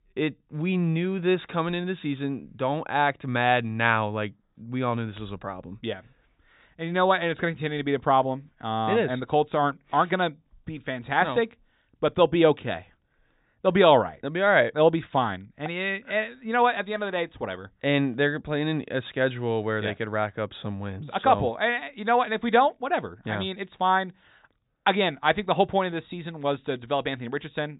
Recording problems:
high frequencies cut off; severe; nothing above 4 kHz

